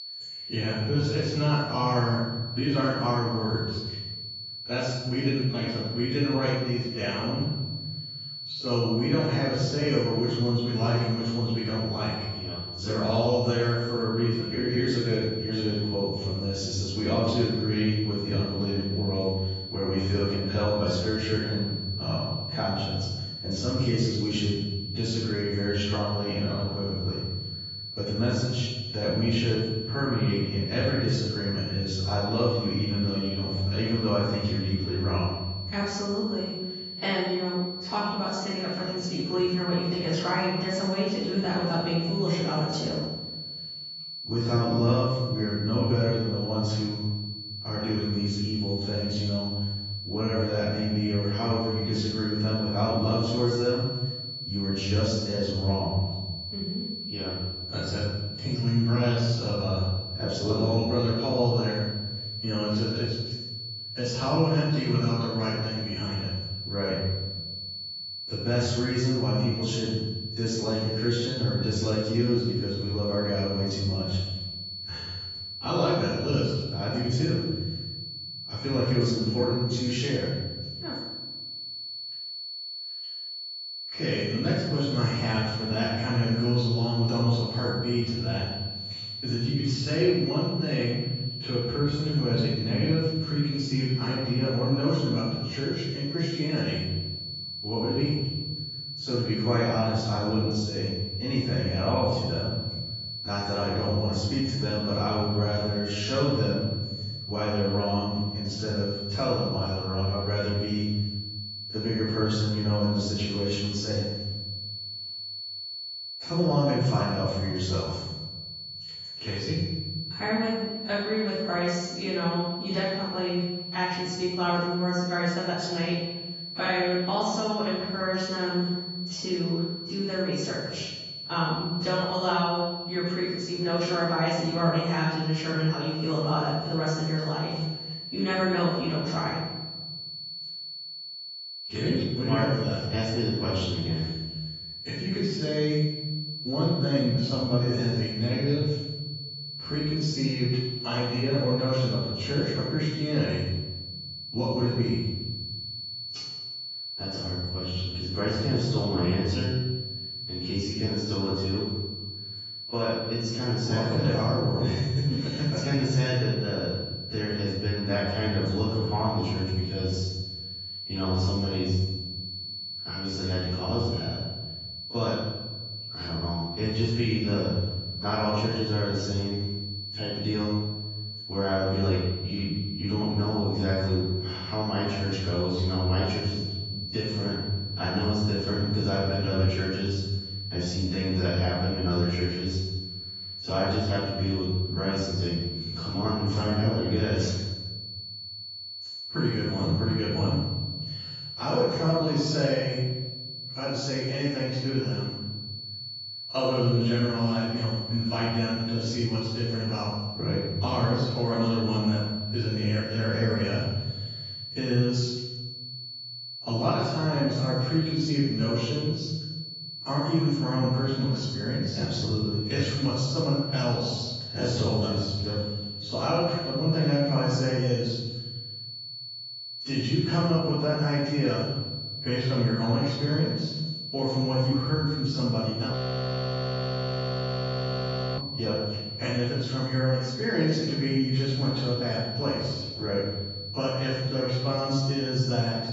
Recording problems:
room echo; strong; dies away in 1.3 s
off-mic speech; far
garbled, watery; badly; nothing above 7.5 kHz
high-pitched whine; loud; throughout; 4.5 kHz, 7 dB below the speech
audio freezing; at 3:56 for 2.5 s

